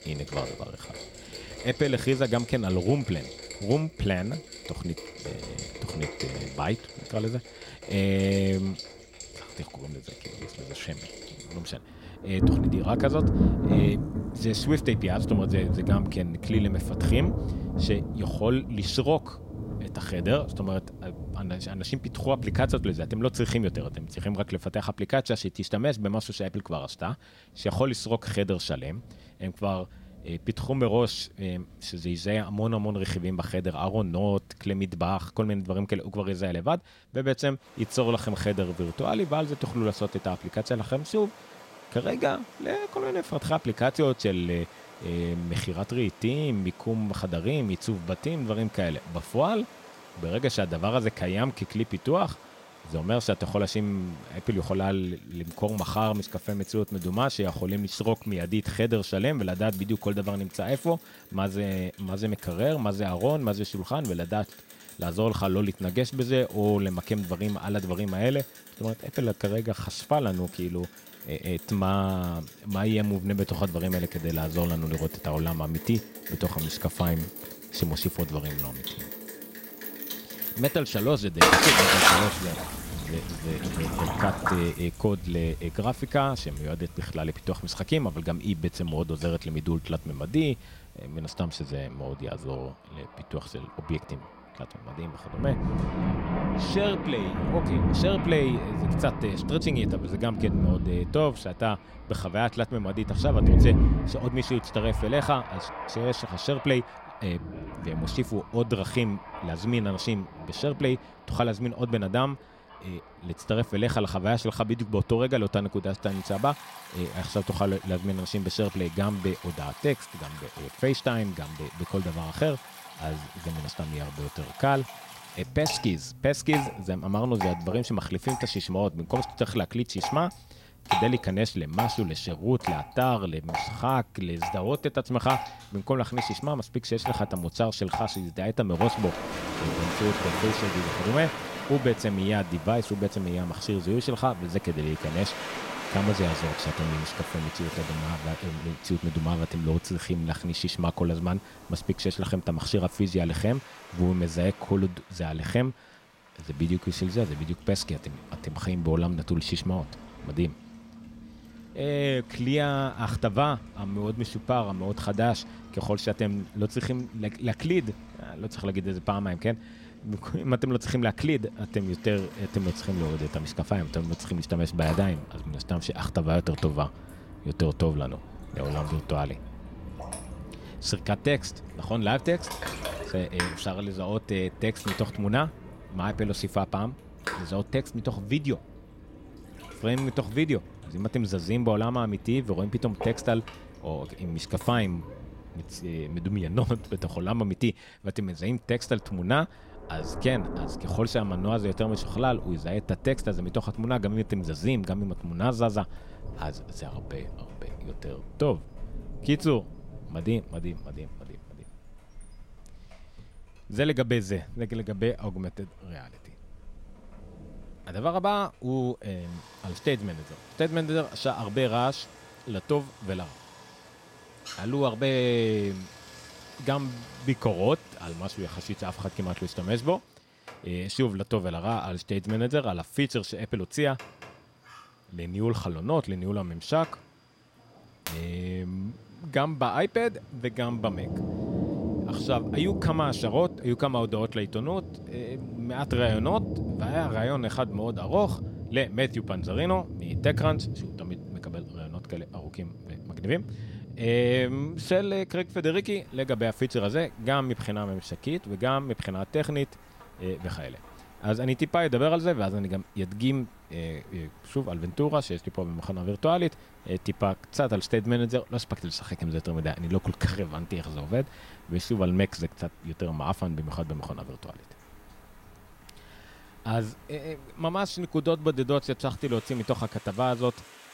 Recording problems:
rain or running water; loud; throughout; 4 dB below the speech

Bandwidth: 16 kHz